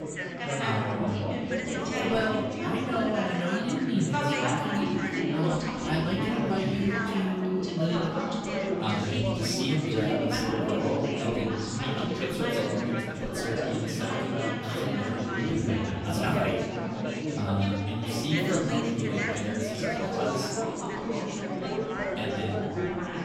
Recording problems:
off-mic speech; far
room echo; noticeable; dies away in 0.8 s
chatter from many people; very loud; throughout; 1 dB above the speech
background music; faint; throughout; 20 dB below the speech

